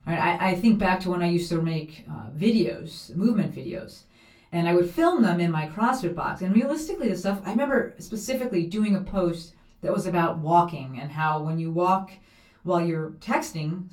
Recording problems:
off-mic speech; far
room echo; very slight; dies away in 0.2 s

